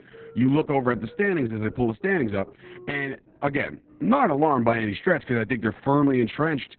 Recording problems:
garbled, watery; badly; nothing above 3.5 kHz
muffled; very slightly; fading above 2.5 kHz
background music; faint; throughout; 25 dB below the speech

